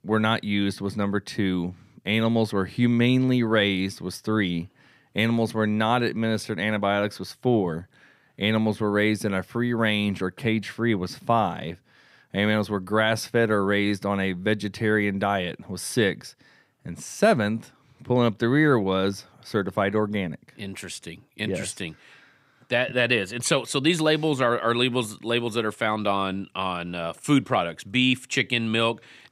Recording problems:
none

